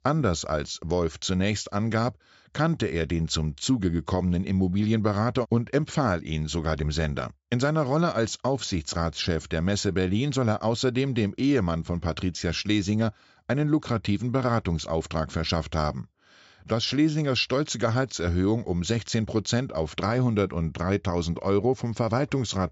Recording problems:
high frequencies cut off; noticeable; nothing above 8 kHz

